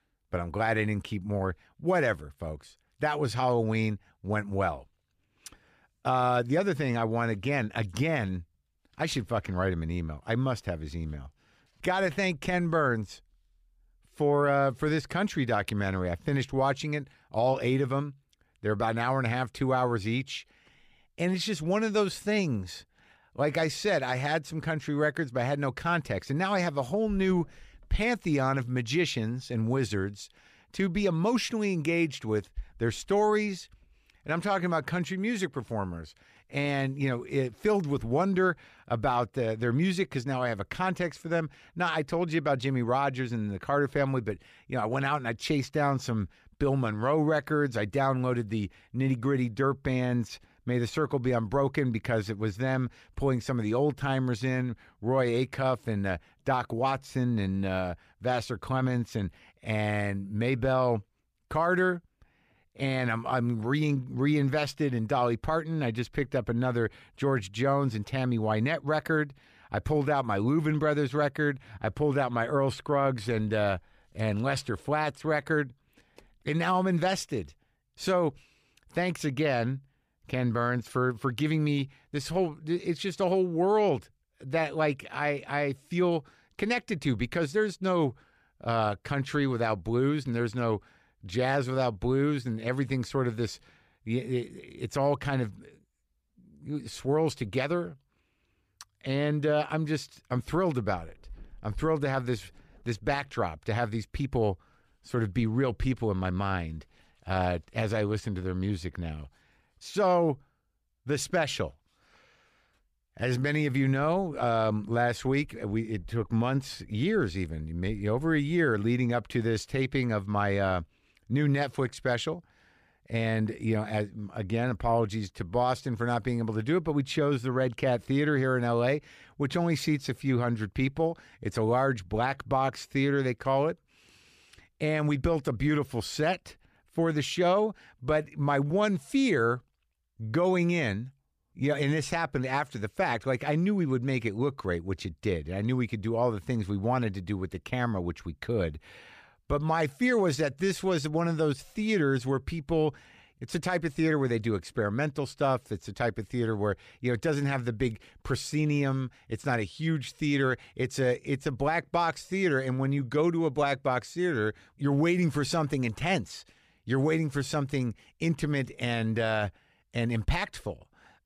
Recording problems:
none

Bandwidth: 14.5 kHz